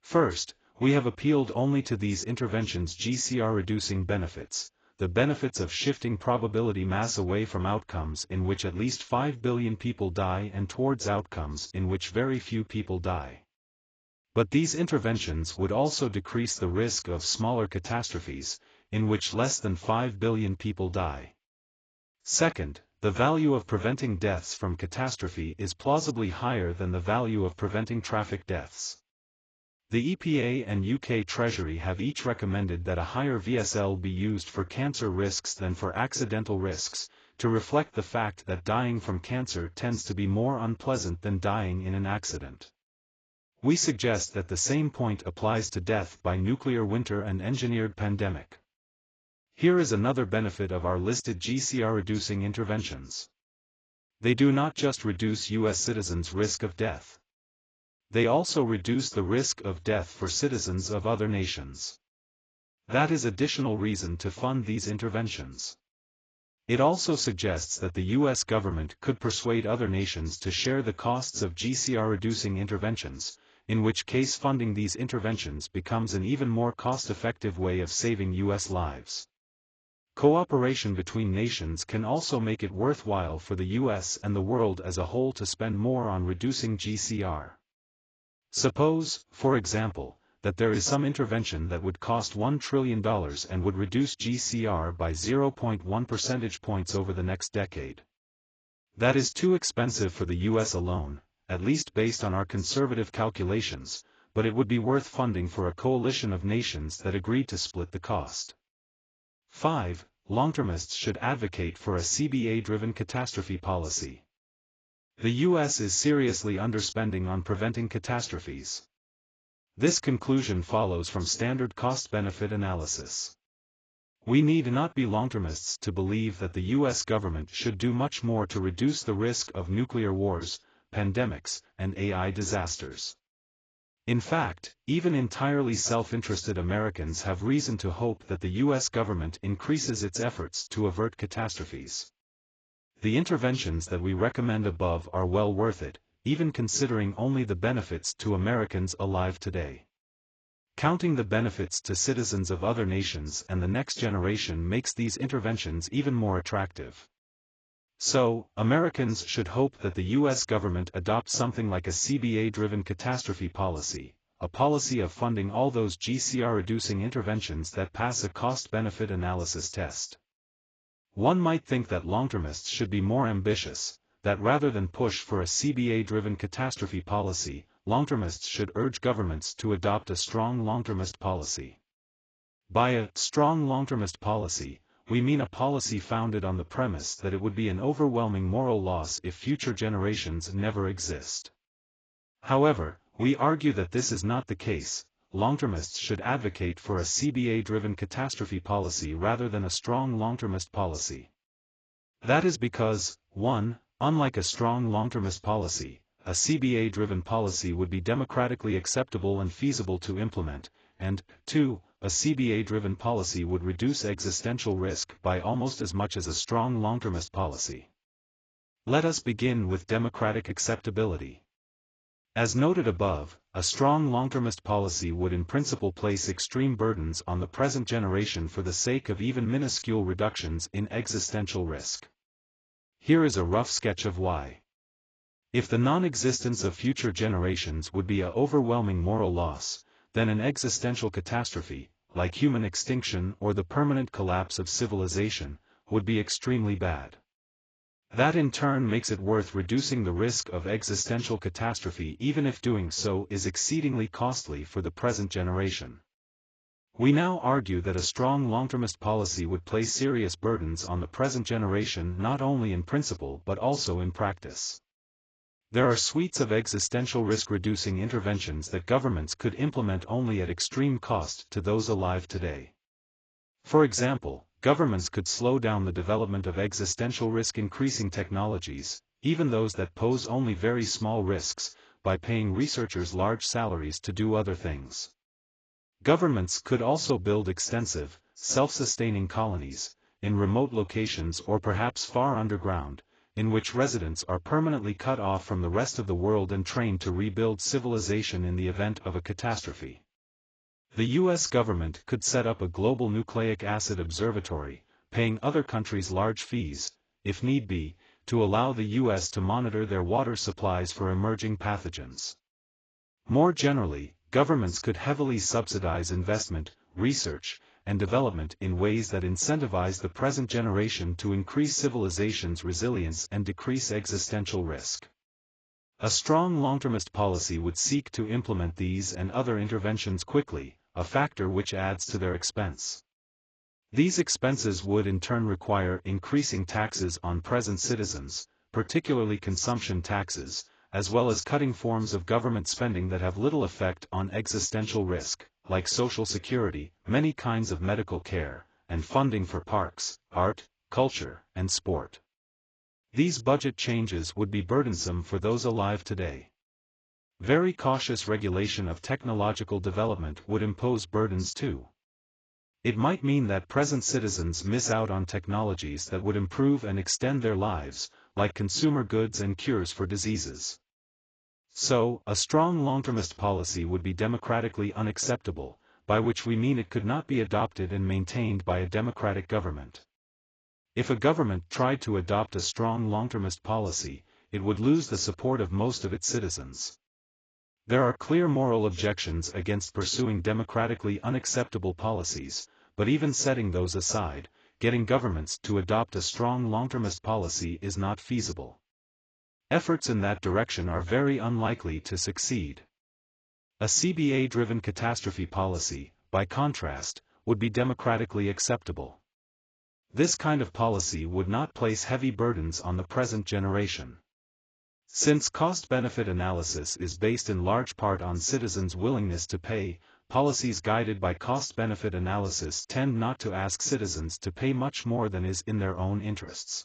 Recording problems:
garbled, watery; badly; nothing above 7.5 kHz

